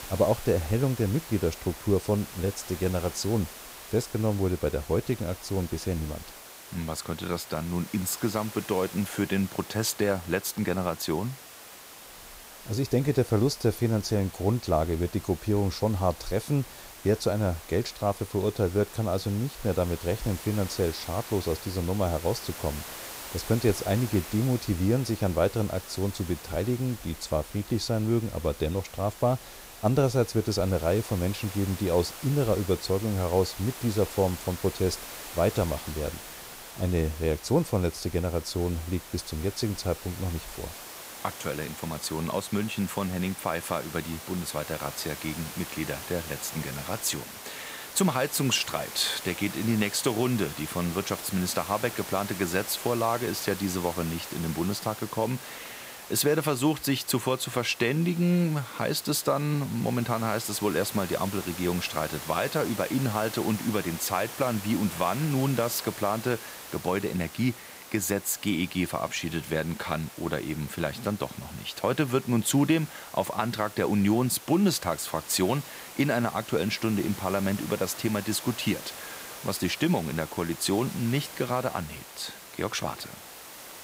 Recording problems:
hiss; noticeable; throughout; 10 dB below the speech

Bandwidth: 15.5 kHz